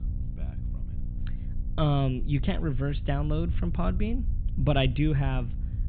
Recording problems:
high frequencies cut off; severe; nothing above 4 kHz
electrical hum; faint; throughout; 60 Hz, 20 dB below the speech
low rumble; faint; throughout; 20 dB below the speech

